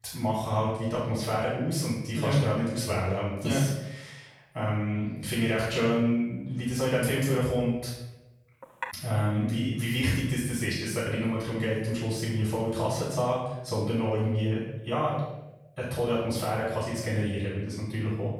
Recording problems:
off-mic speech; far
room echo; noticeable; dies away in 0.8 s
clattering dishes; noticeable; at 8.5 s; peak 9 dB below the speech

